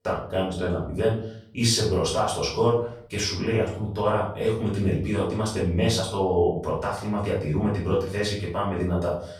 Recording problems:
off-mic speech; far
room echo; noticeable; dies away in 0.5 s

